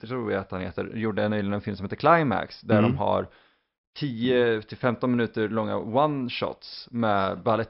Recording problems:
high frequencies cut off; noticeable; nothing above 5.5 kHz

